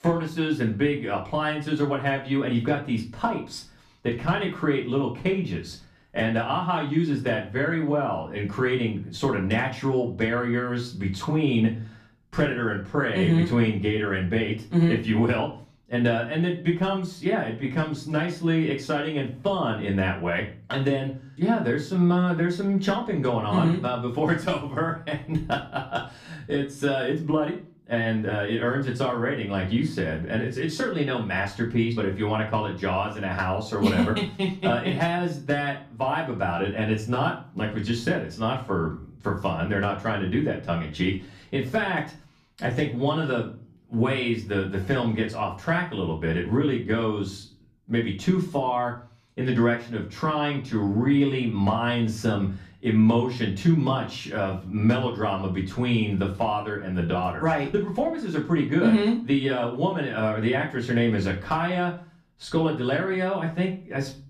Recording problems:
off-mic speech; far
room echo; slight; dies away in 0.3 s

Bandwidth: 14.5 kHz